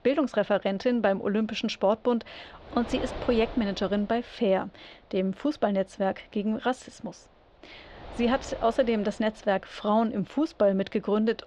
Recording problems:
muffled; very; fading above 4.5 kHz
wind noise on the microphone; occasional gusts; 15 dB below the speech

